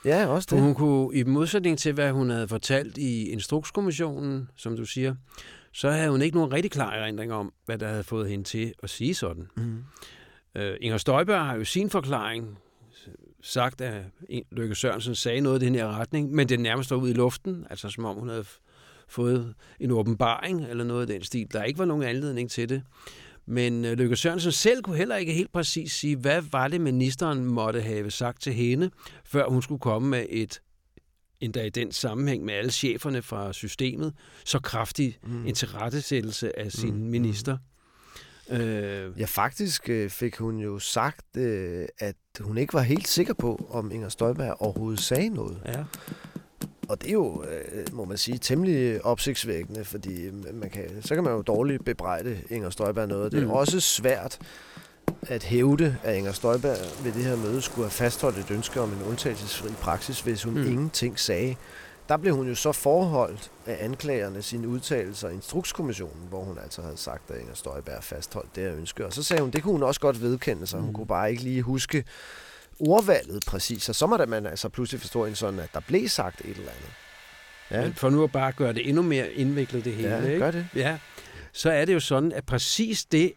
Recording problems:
household noises; noticeable; from 43 s on; 15 dB below the speech

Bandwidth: 17.5 kHz